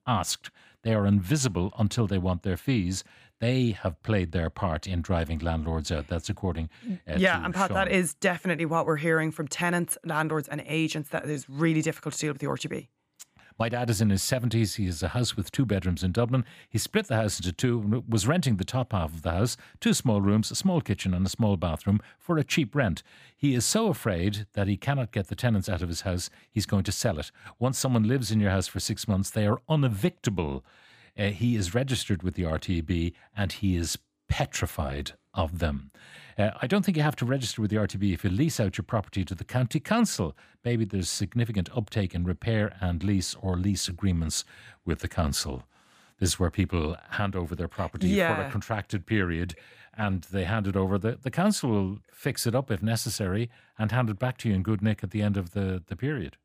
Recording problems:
none

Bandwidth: 15 kHz